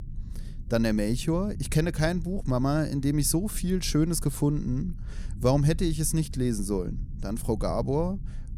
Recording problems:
low rumble; faint; throughout; 25 dB below the speech

